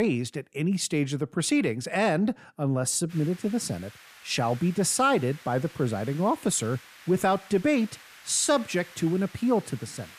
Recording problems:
hiss; faint; from 3 s on; 20 dB below the speech
abrupt cut into speech; at the start

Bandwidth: 14.5 kHz